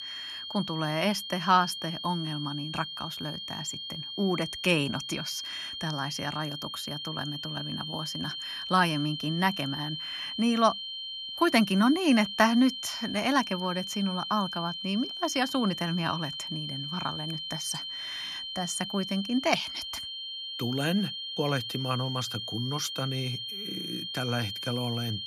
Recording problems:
high-pitched whine; loud; throughout; 3 kHz, 5 dB below the speech

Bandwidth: 15 kHz